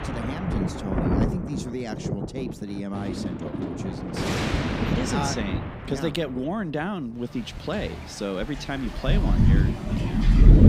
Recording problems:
rain or running water; very loud; throughout; 5 dB above the speech

